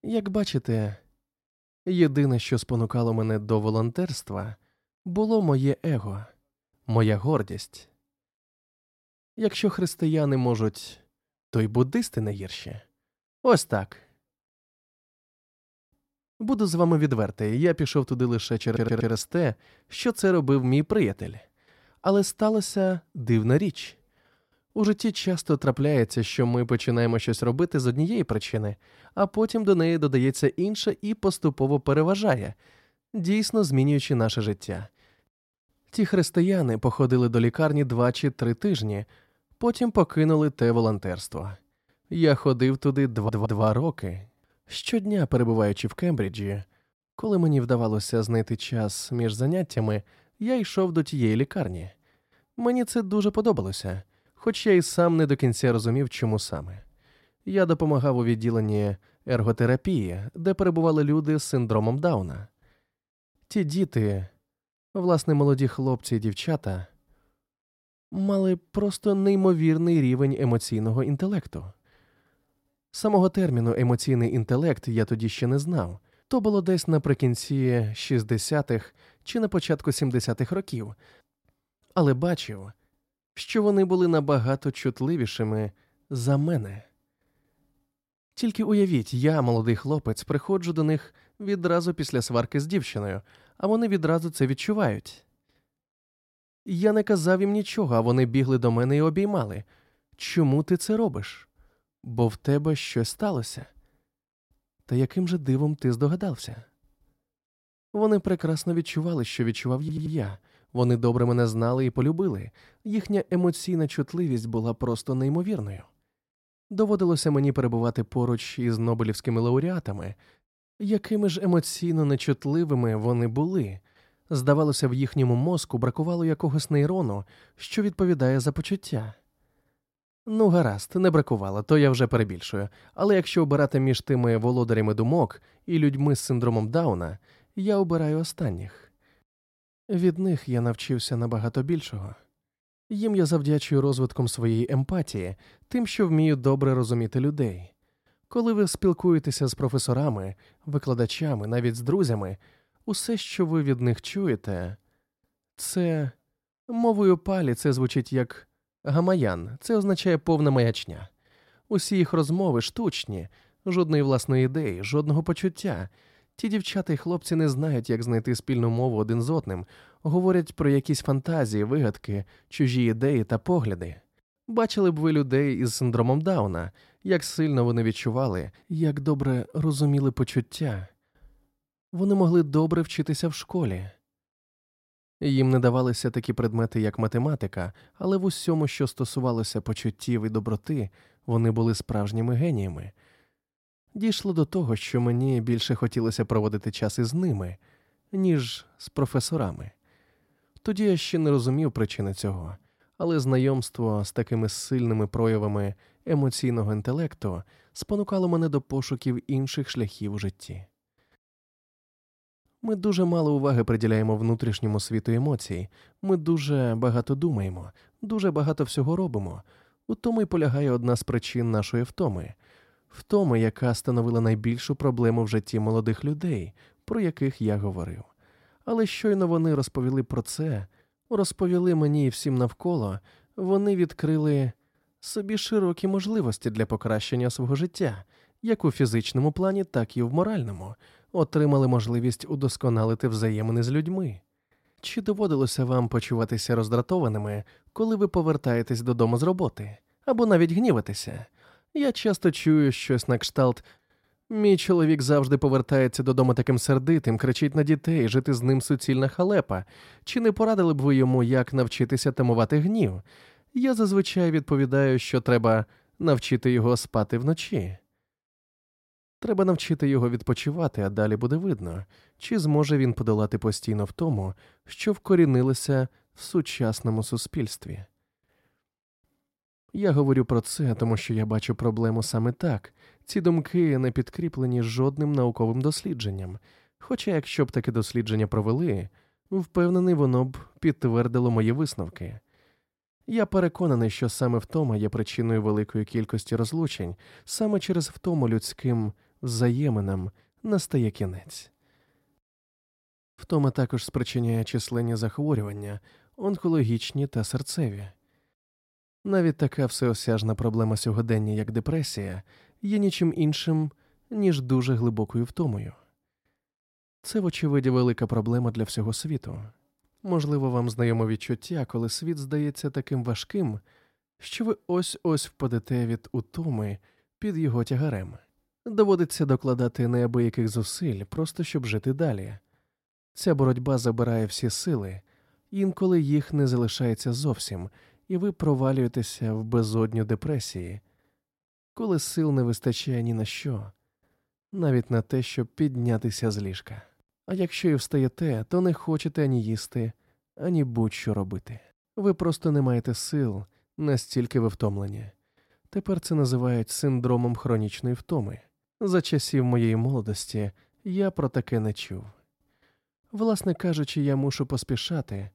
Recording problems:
audio stuttering; at 19 s, at 43 s and at 1:50

